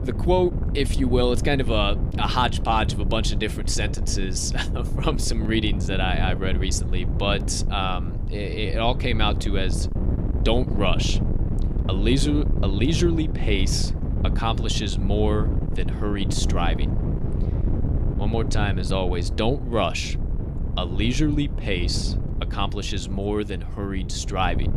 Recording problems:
wind noise on the microphone; occasional gusts; 10 dB below the speech

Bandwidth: 15 kHz